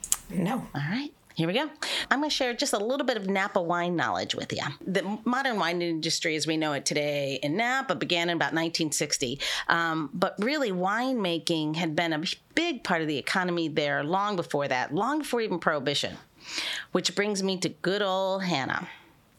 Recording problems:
squashed, flat; heavily

